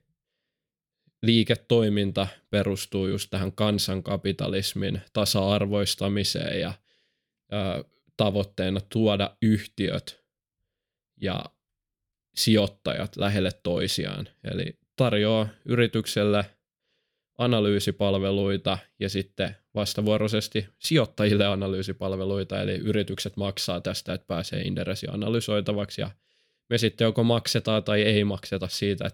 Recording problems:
none

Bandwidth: 17.5 kHz